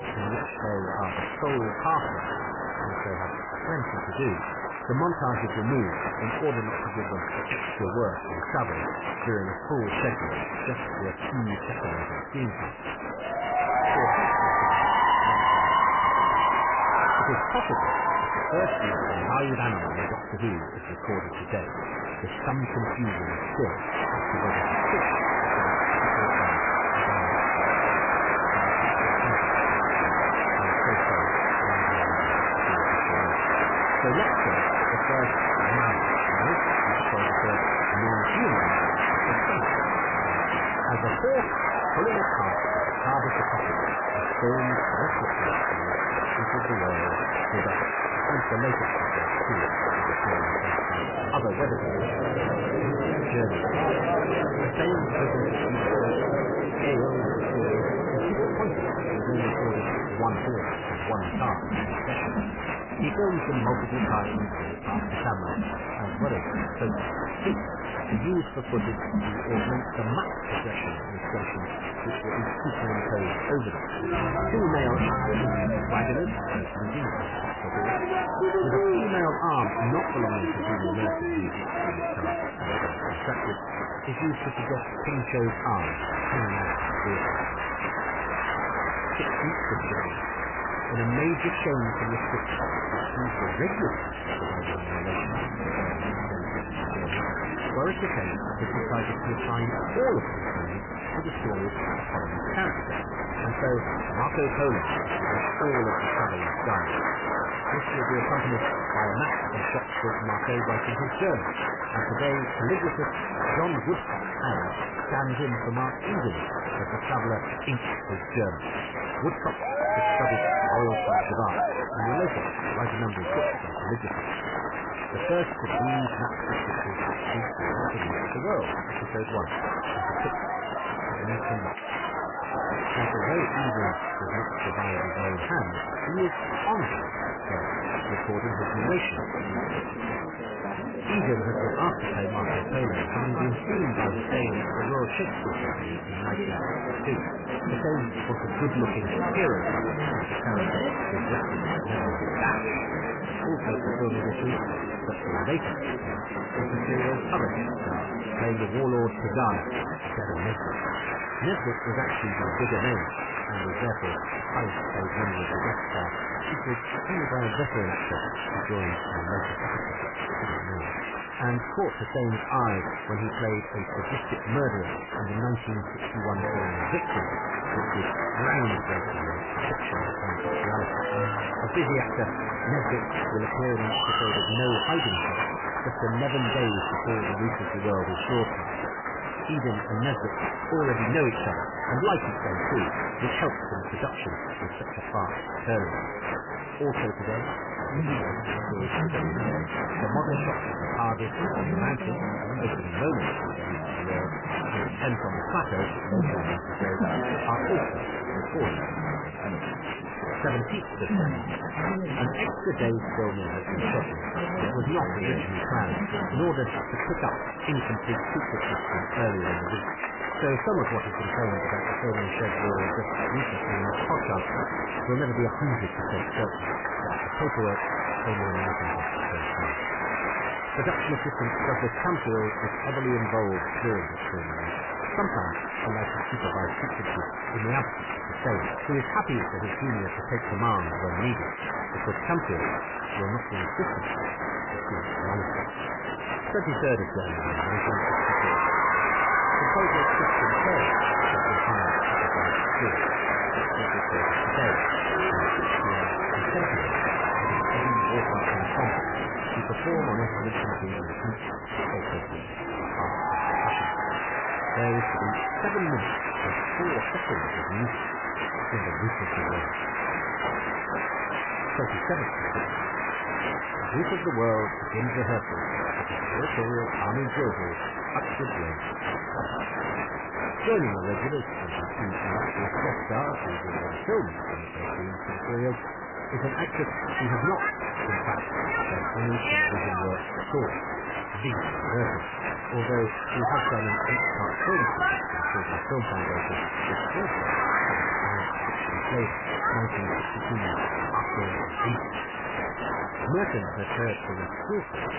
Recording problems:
garbled, watery; badly; nothing above 3 kHz
distortion; slight; 6% of the sound clipped
crowd noise; very loud; throughout; 3 dB above the speech
voice in the background; noticeable; throughout; 15 dB below the speech

